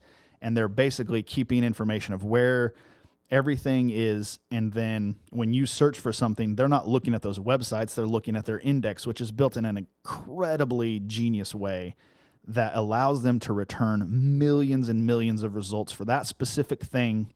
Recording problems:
garbled, watery; slightly

